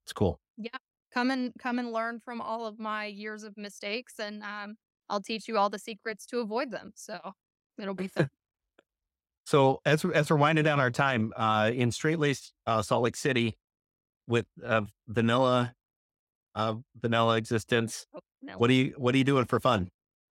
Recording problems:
none

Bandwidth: 16 kHz